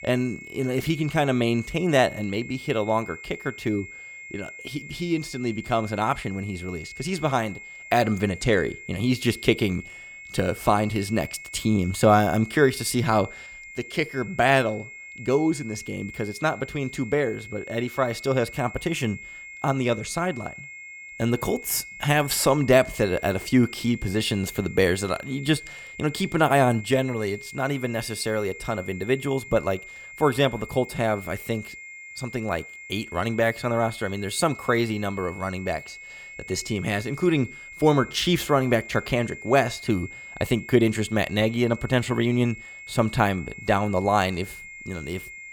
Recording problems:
high-pitched whine; noticeable; throughout; 2 kHz, 15 dB below the speech

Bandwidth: 17.5 kHz